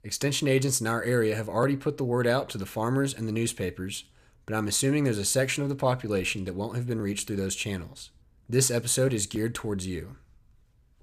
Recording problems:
none

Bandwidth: 14.5 kHz